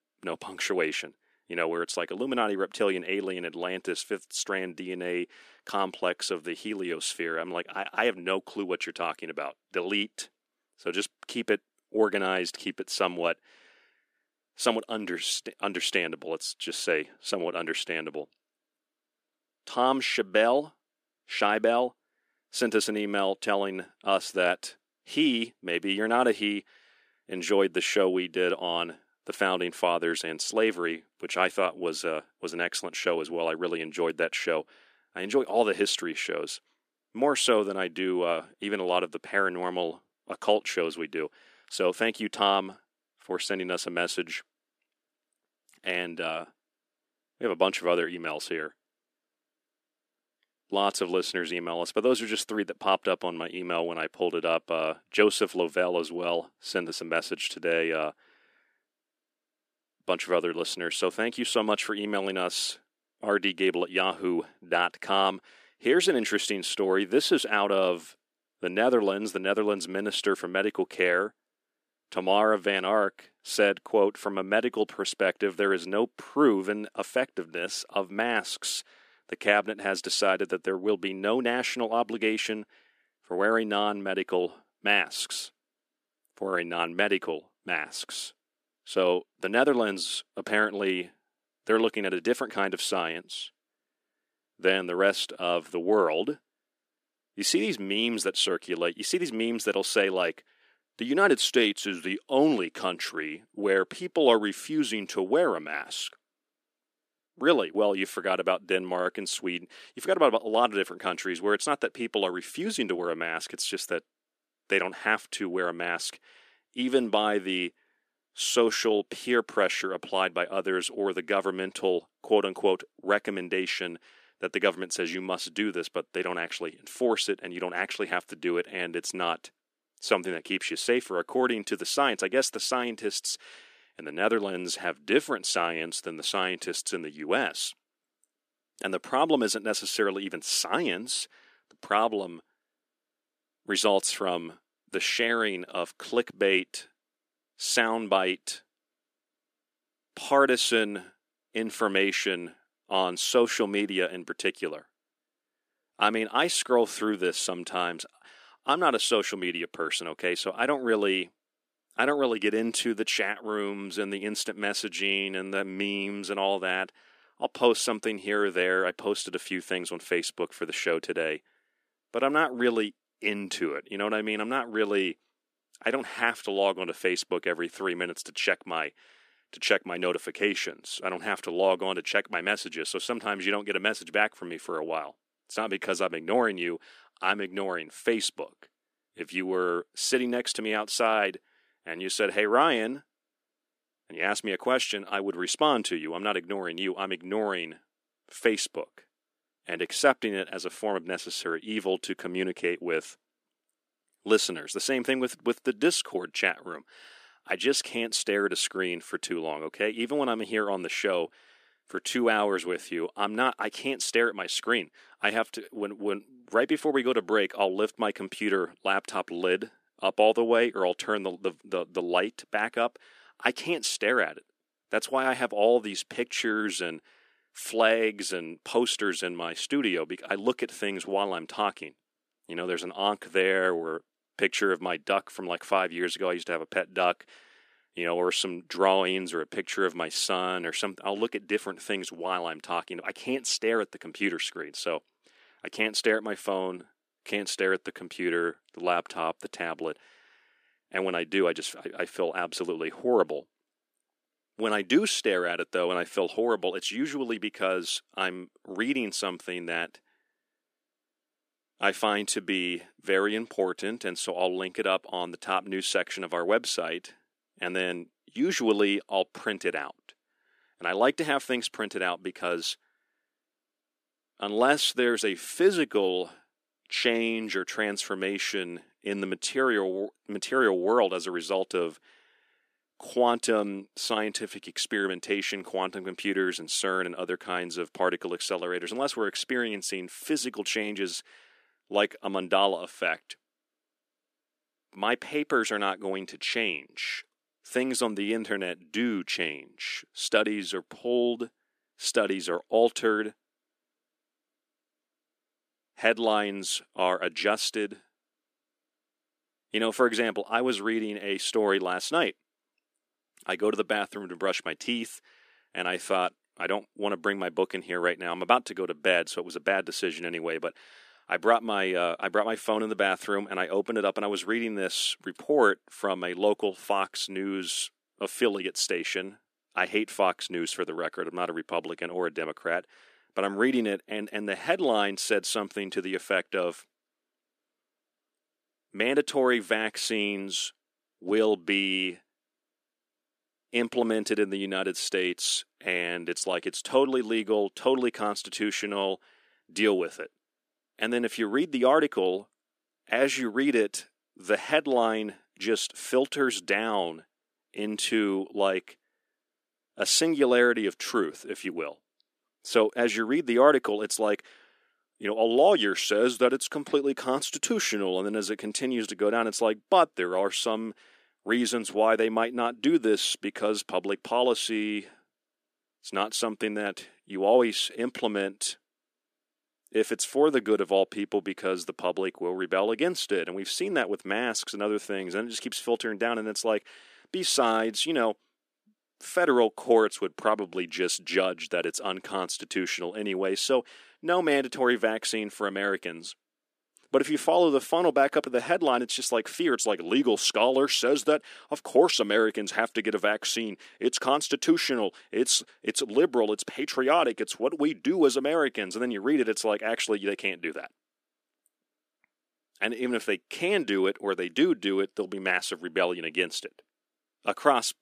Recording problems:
thin; somewhat; fading below 300 Hz

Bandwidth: 14.5 kHz